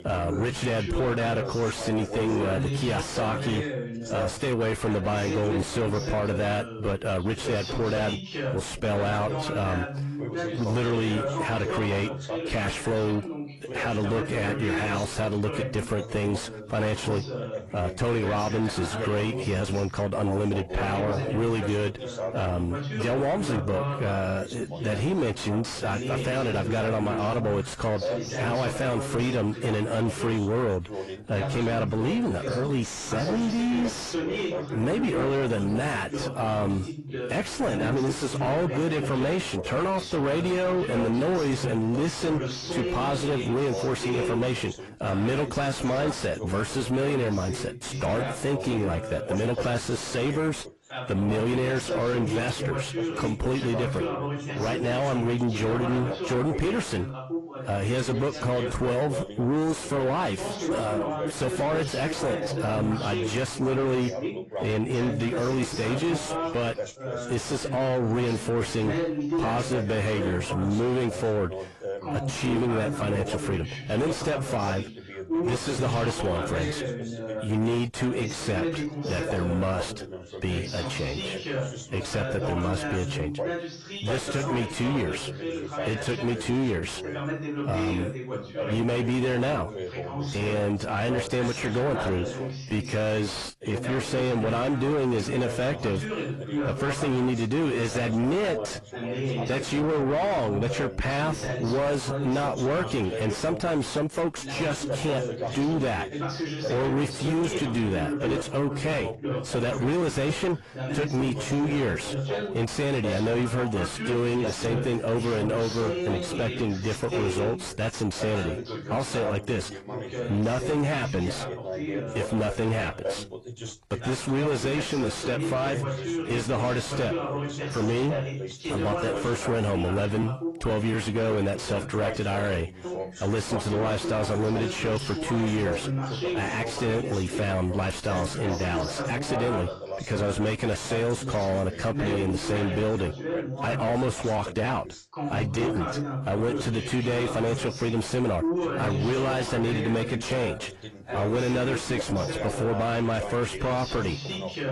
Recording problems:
distortion; heavy; 6 dB below the speech
garbled, watery; slightly; nothing above 11 kHz
background chatter; loud; throughout; 2 voices, 5 dB below the speech

